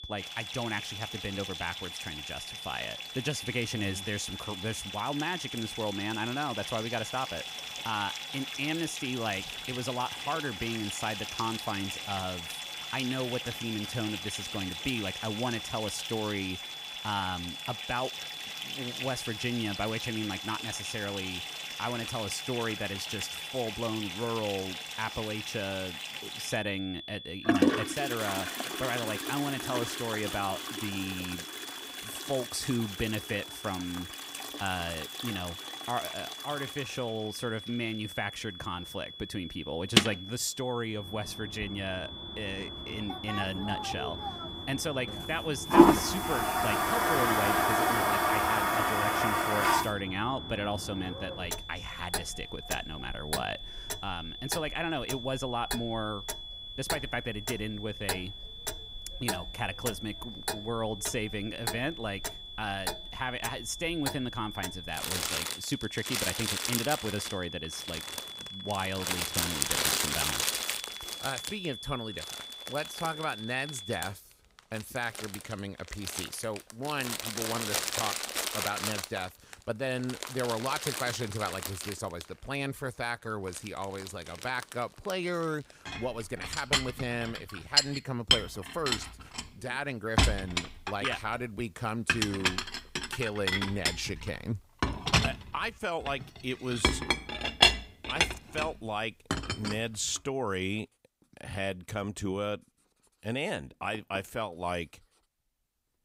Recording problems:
household noises; very loud; throughout; 2 dB above the speech
high-pitched whine; loud; until 1:14; 3.5 kHz, 6 dB below the speech

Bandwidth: 15.5 kHz